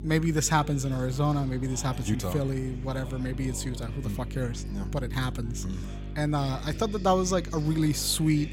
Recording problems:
electrical hum; noticeable; throughout; 50 Hz, 20 dB below the speech
chatter from many people; noticeable; throughout; 20 dB below the speech

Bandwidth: 16 kHz